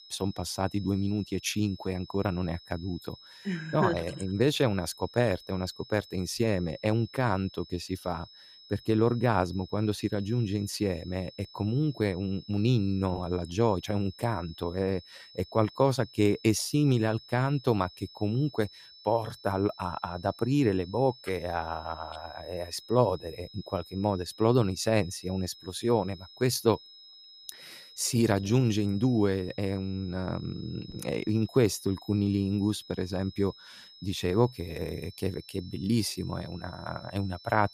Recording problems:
high-pitched whine; faint; throughout; 5 kHz, 20 dB below the speech

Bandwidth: 15 kHz